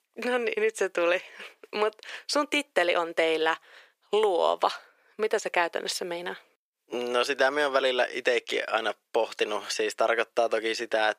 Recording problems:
thin; very; fading below 400 Hz

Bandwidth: 15 kHz